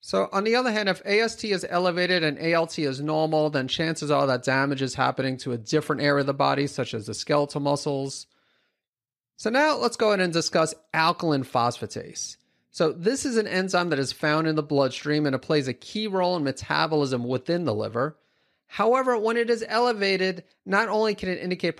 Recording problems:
none

